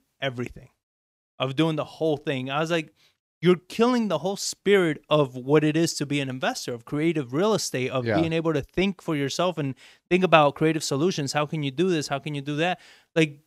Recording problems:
none

